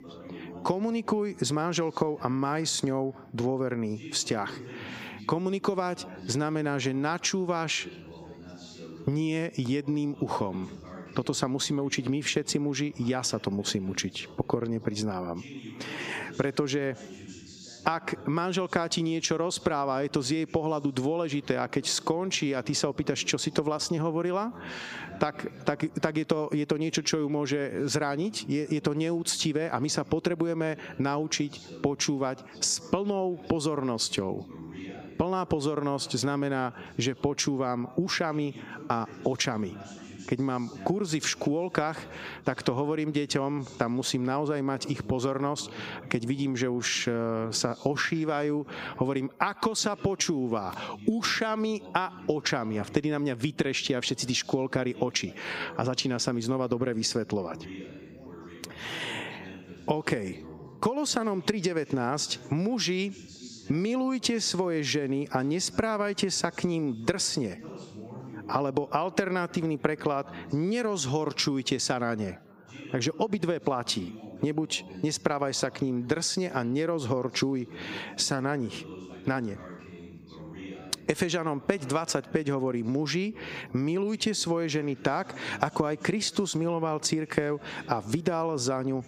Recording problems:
squashed, flat; heavily, background pumping
background chatter; noticeable; throughout; 3 voices, 20 dB below the speech

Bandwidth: 15.5 kHz